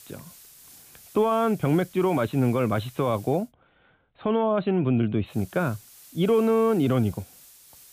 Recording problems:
high frequencies cut off; severe; nothing above 4 kHz
hiss; faint; until 3.5 s and from 5.5 s on; 25 dB below the speech

